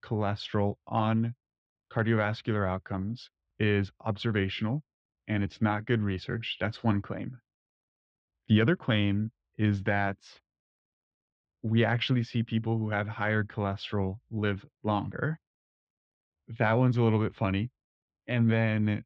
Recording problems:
muffled; slightly; fading above 3.5 kHz

